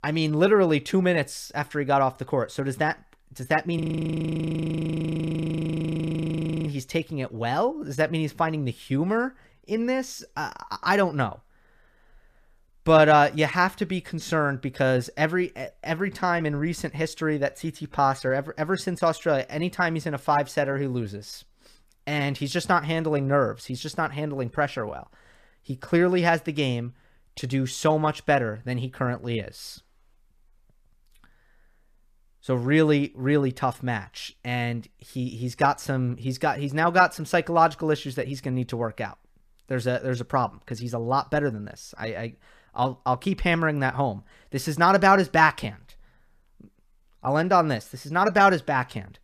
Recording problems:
audio freezing; at 4 s for 3 s

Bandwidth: 14.5 kHz